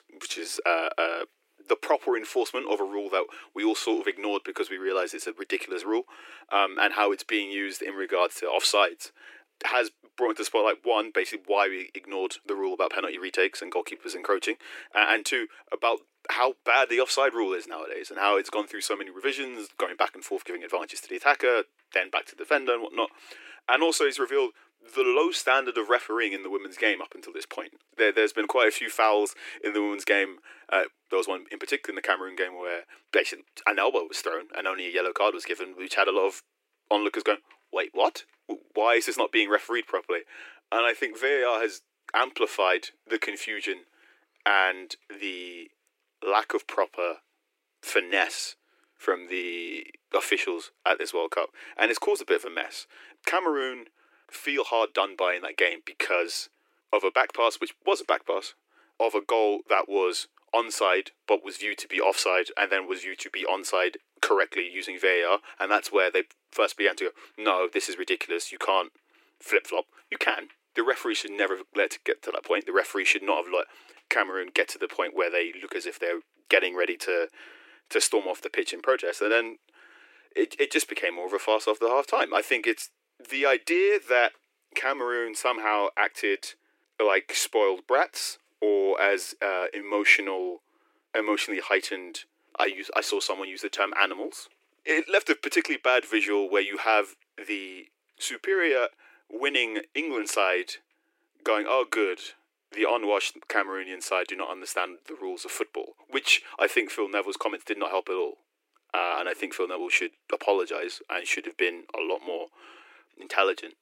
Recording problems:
thin; very; fading below 300 Hz

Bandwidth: 16 kHz